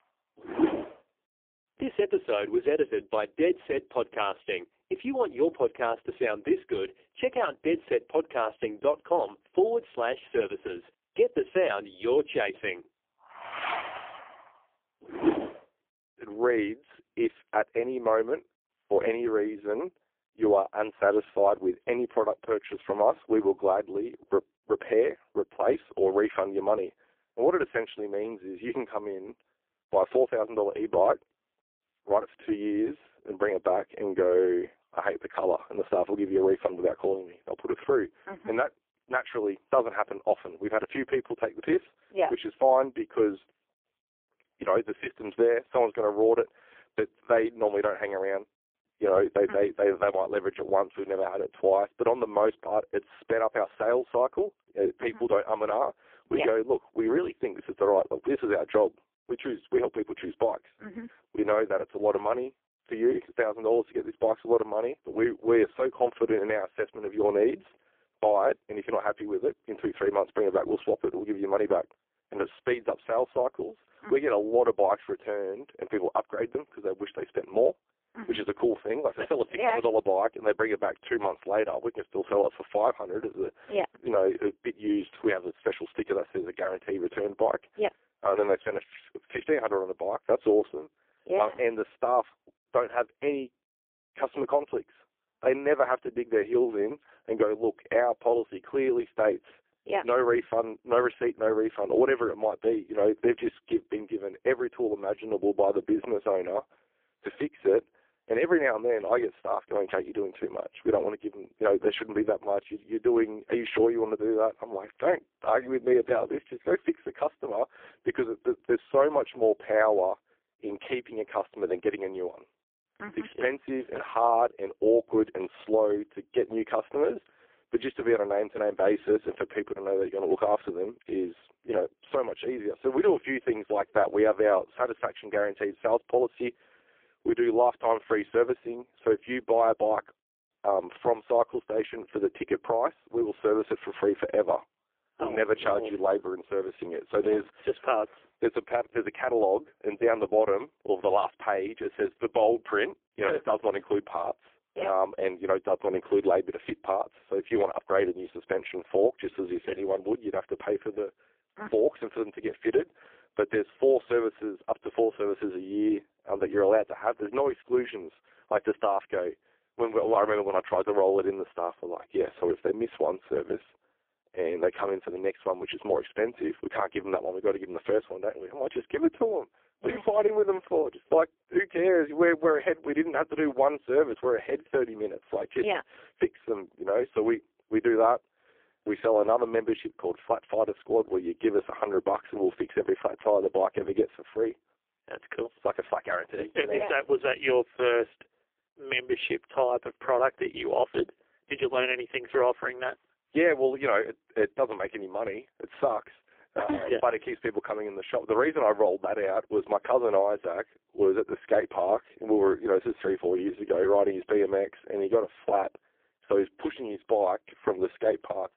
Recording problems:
phone-call audio; poor line; nothing above 3 kHz

